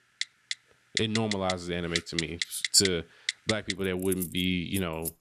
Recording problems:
household noises; loud; throughout; 5 dB below the speech

